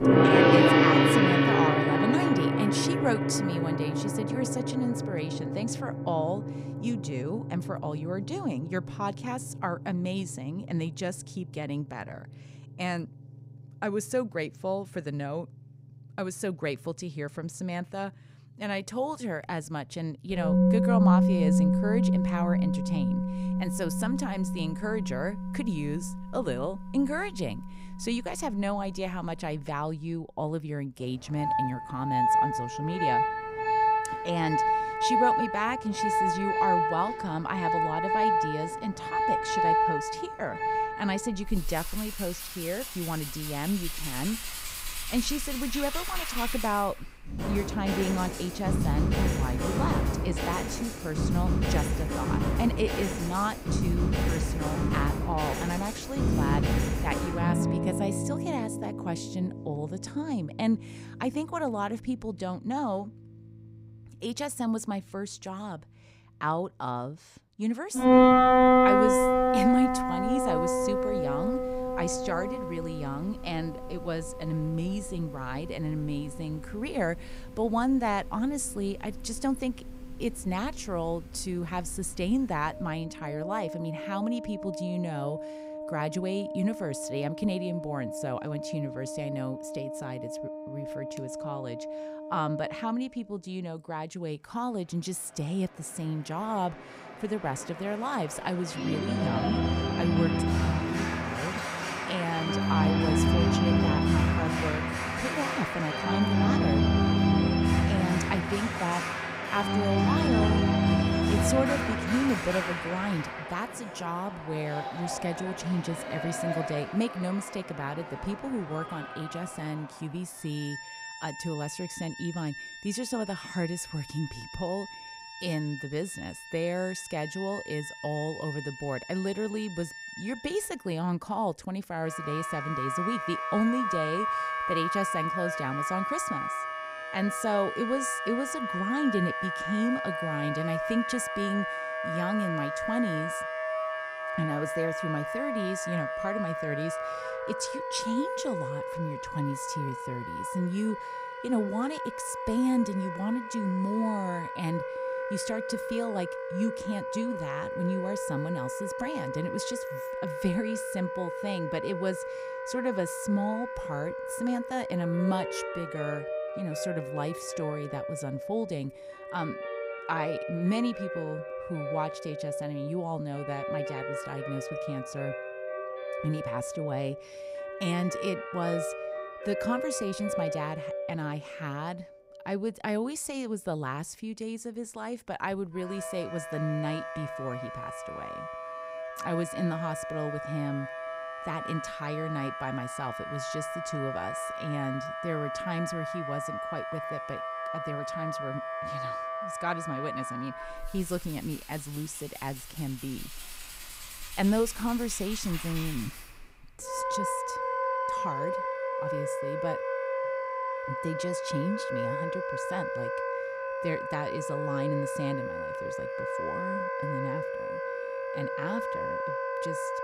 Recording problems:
background music; very loud; throughout; 3 dB above the speech

